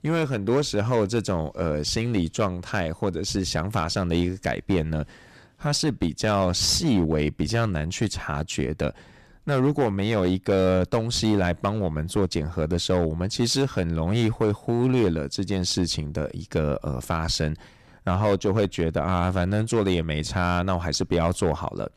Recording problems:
distortion; slight; 7% of the sound clipped

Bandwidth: 14.5 kHz